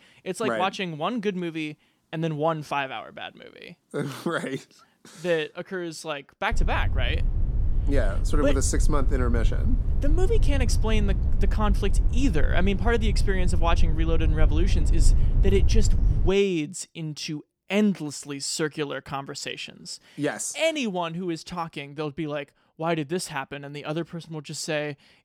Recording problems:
low rumble; noticeable; from 6.5 to 16 s; 15 dB below the speech

